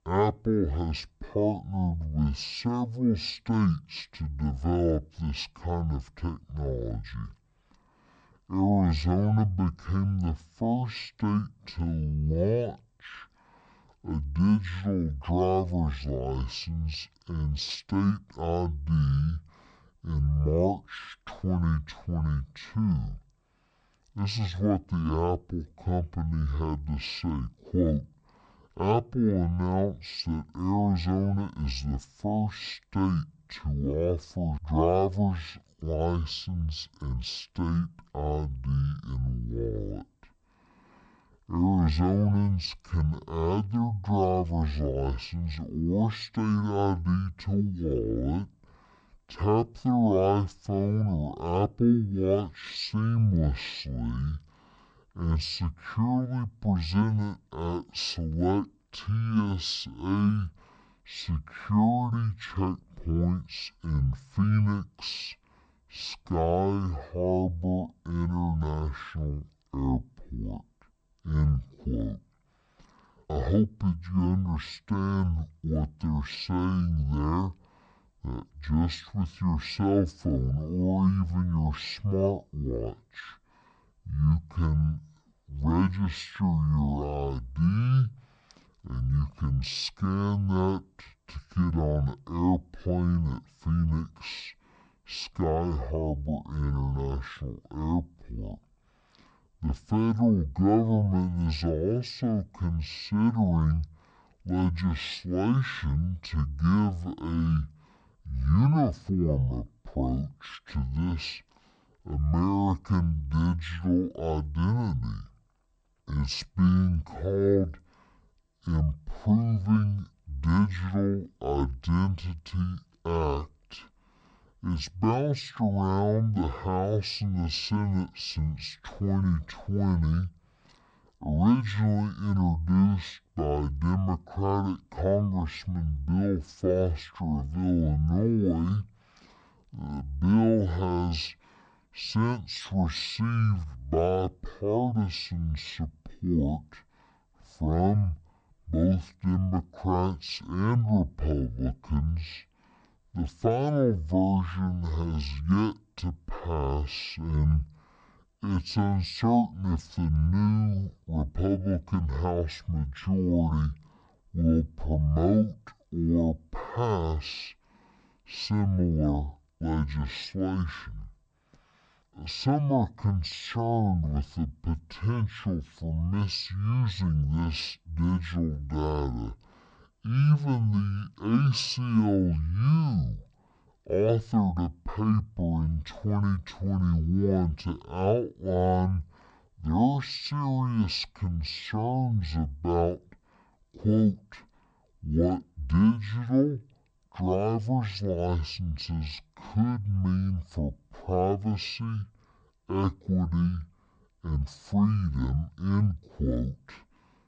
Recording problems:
wrong speed and pitch; too slow and too low; 0.5 times normal speed

